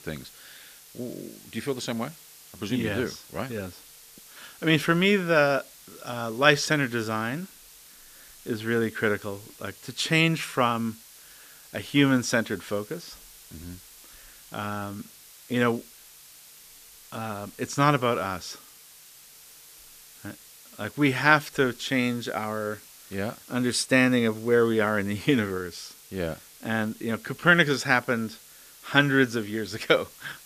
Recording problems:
hiss; faint; throughout; 20 dB below the speech

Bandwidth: 14.5 kHz